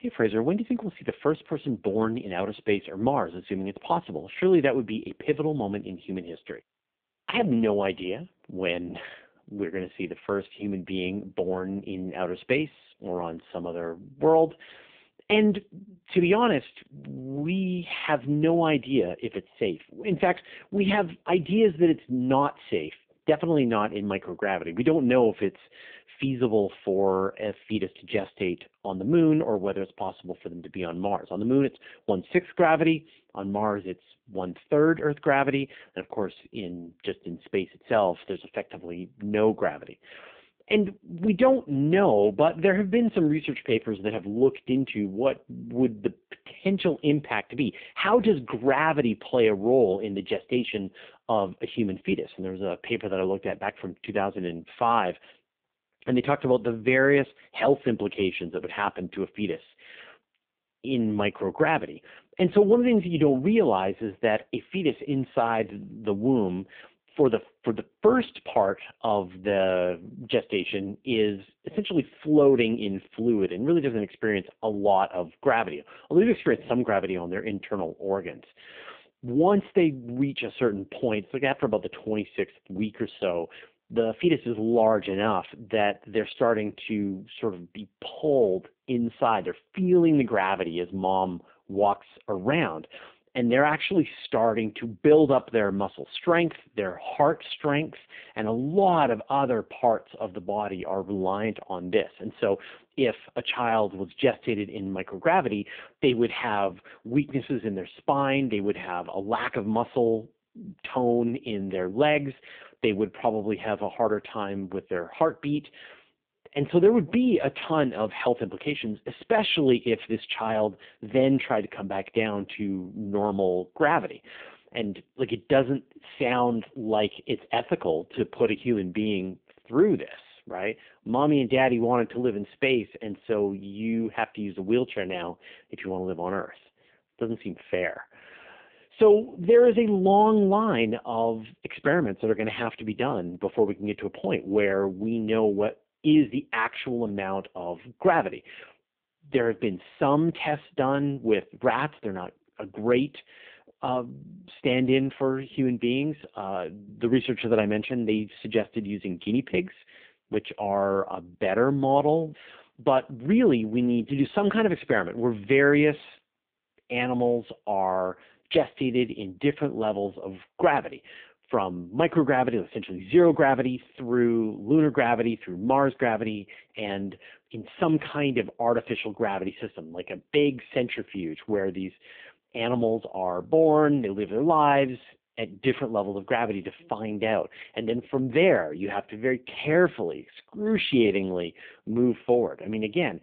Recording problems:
phone-call audio; poor line

